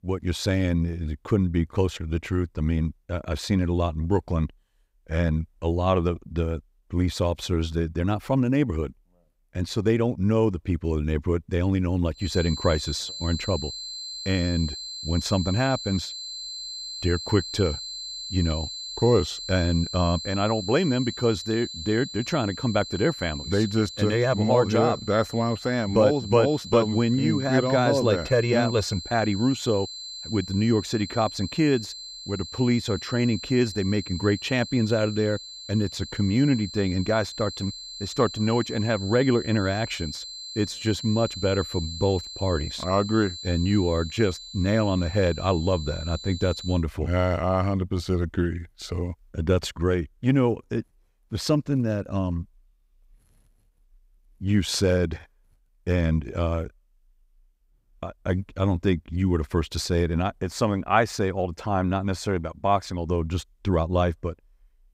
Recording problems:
high-pitched whine; loud; from 12 to 47 s; 4 kHz, 10 dB below the speech

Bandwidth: 15.5 kHz